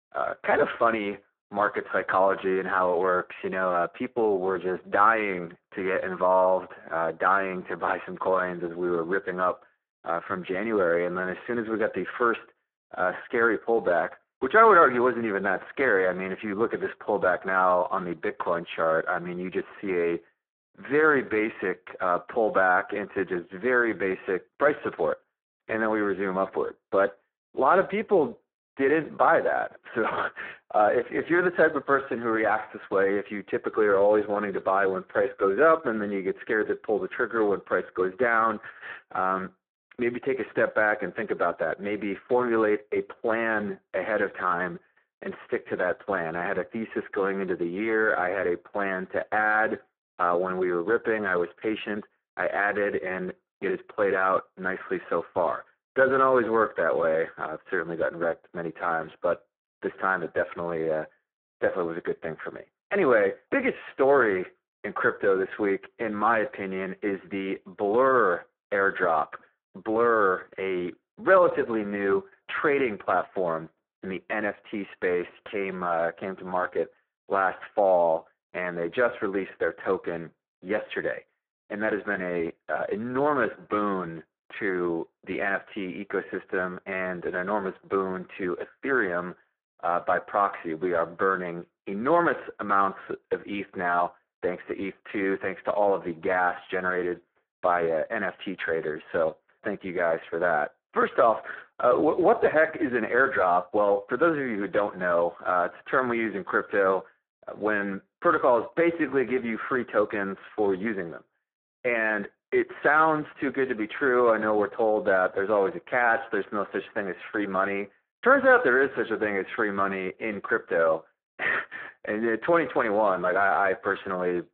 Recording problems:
phone-call audio; poor line; nothing above 3.5 kHz
muffled; very slightly; fading above 2.5 kHz

